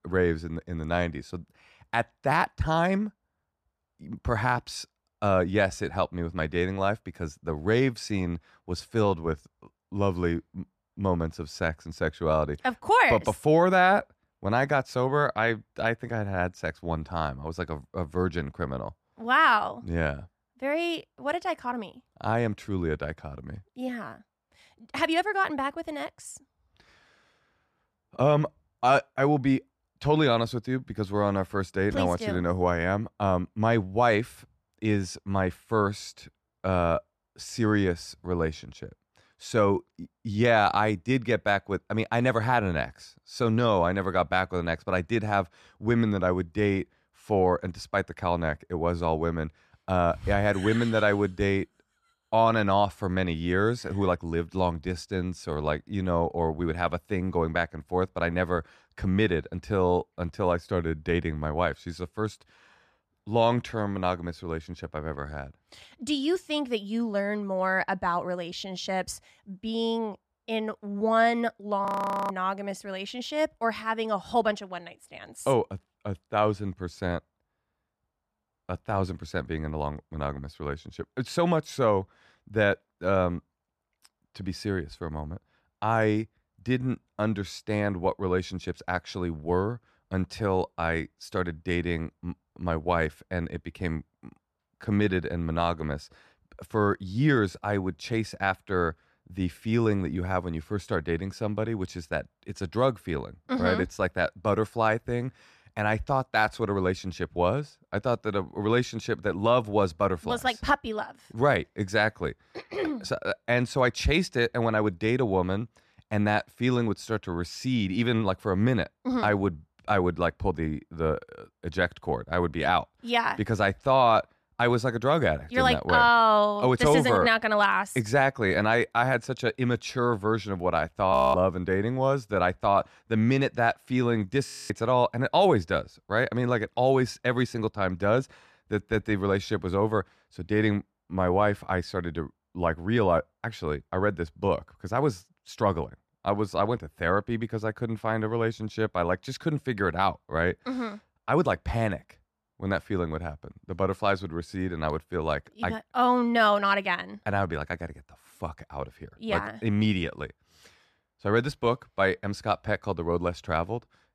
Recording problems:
audio freezing; at 1:12, at 2:11 and at 2:14

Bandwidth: 14.5 kHz